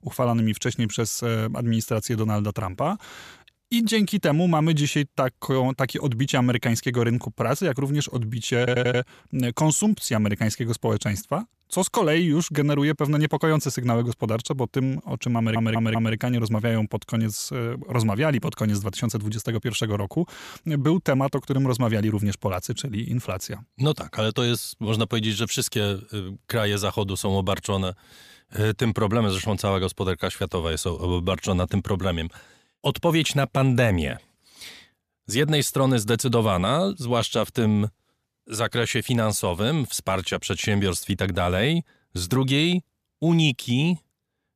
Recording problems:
audio stuttering; at 8.5 s and at 15 s

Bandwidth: 14.5 kHz